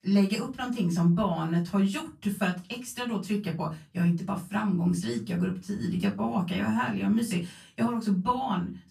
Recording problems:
off-mic speech; far
room echo; very slight; dies away in 0.2 s

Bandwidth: 14 kHz